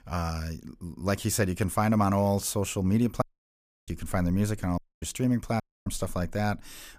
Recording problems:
audio cutting out; at 3 s for 0.5 s, at 5 s and at 5.5 s

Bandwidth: 15 kHz